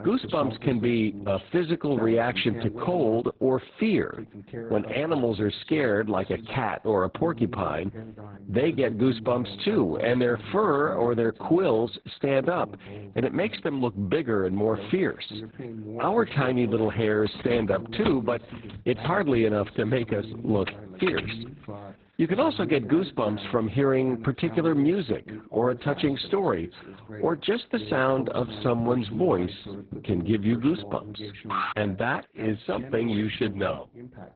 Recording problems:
garbled, watery; badly; nothing above 4 kHz
voice in the background; noticeable; throughout; 15 dB below the speech
jangling keys; noticeable; from 17 to 21 s; peak 7 dB below the speech
alarm; noticeable; at 32 s; peak 3 dB below the speech

